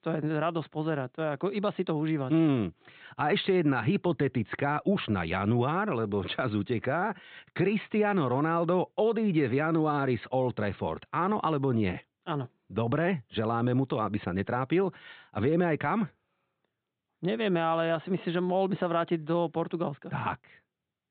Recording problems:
high frequencies cut off; severe; nothing above 4 kHz

